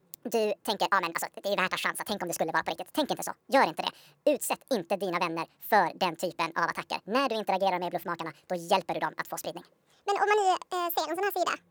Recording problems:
wrong speed and pitch; too fast and too high; 1.6 times normal speed

